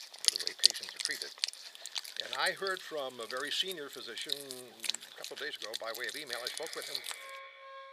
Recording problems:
echo of what is said; strong; from 6.5 s on; 320 ms later, 10 dB below the speech
thin; very; fading below 600 Hz
background music; very loud; throughout; 3 dB above the speech
machinery noise; faint; throughout; 25 dB below the speech

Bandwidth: 15 kHz